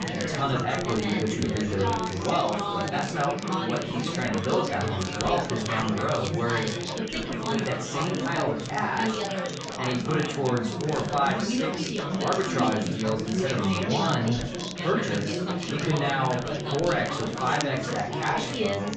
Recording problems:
off-mic speech; far
high frequencies cut off; noticeable; nothing above 8 kHz
room echo; slight; dies away in 0.4 s
chatter from many people; loud; throughout; 1 dB below the speech
crackle, like an old record; noticeable; 10 dB below the speech

